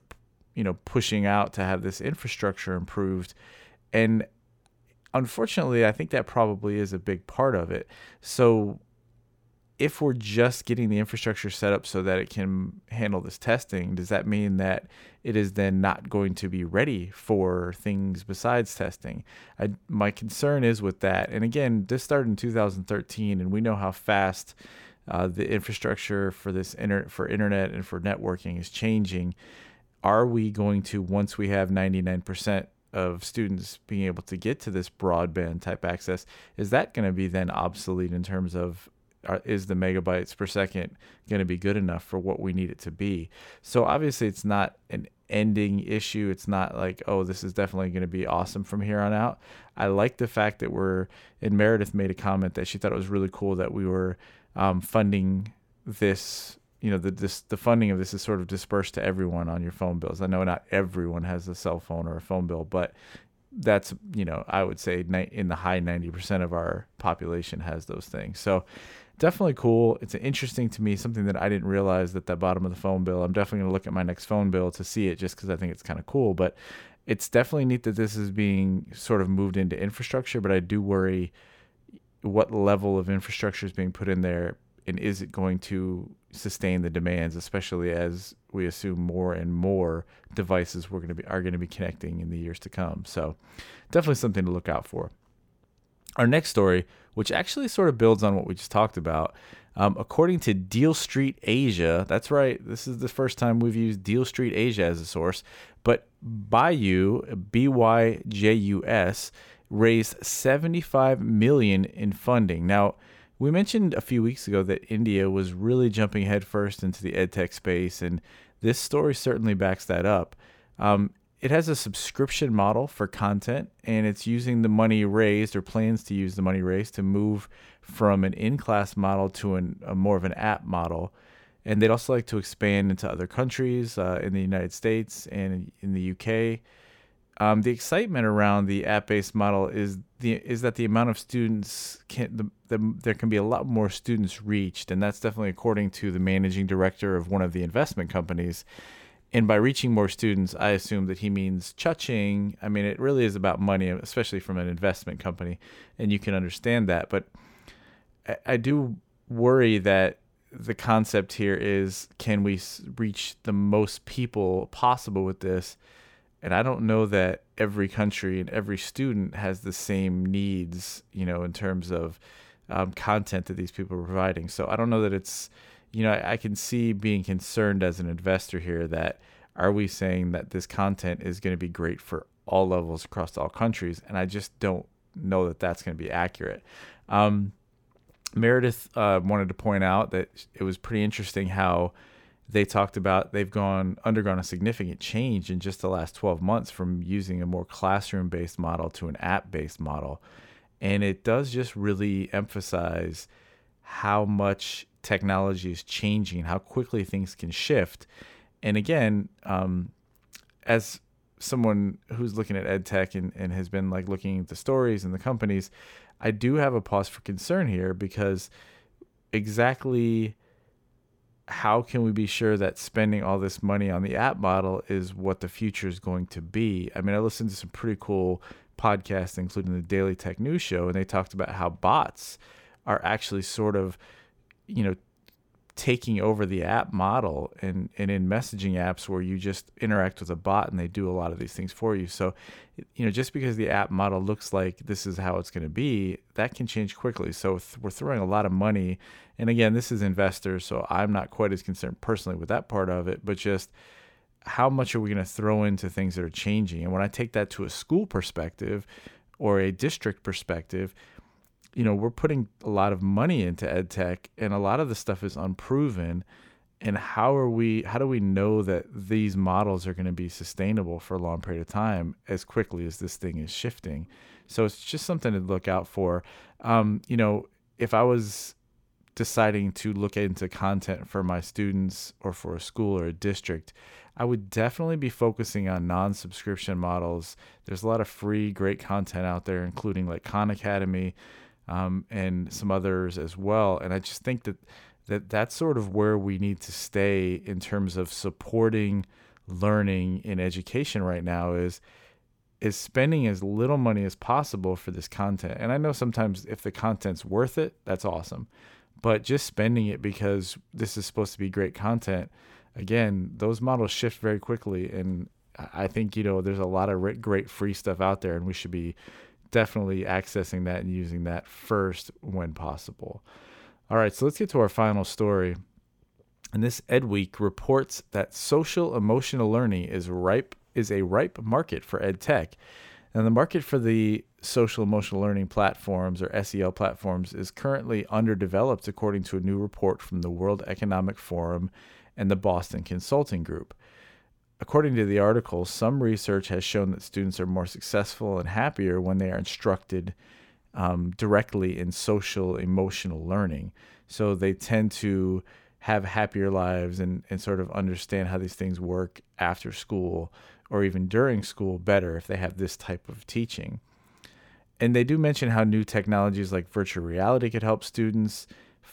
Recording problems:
none

